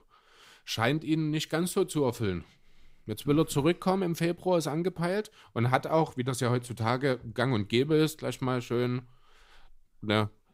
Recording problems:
none

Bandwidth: 15.5 kHz